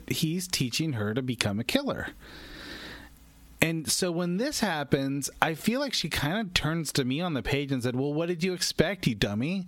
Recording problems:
squashed, flat; heavily

